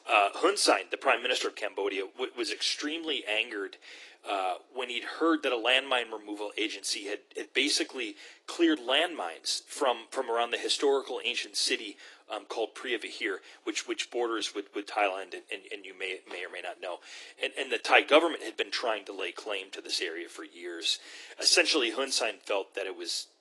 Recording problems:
thin; very; fading below 300 Hz
garbled, watery; slightly; nothing above 10.5 kHz

